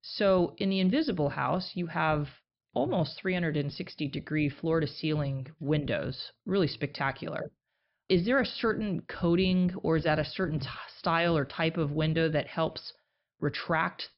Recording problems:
high frequencies cut off; noticeable; nothing above 5.5 kHz

